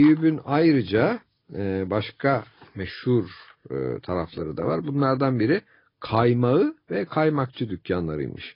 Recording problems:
garbled, watery; badly
high frequencies cut off; noticeable; nothing above 5 kHz
abrupt cut into speech; at the start

